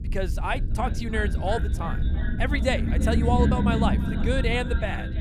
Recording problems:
echo of what is said; noticeable; throughout; 330 ms later, 15 dB below the speech
low rumble; loud; throughout; 9 dB below the speech

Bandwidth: 14.5 kHz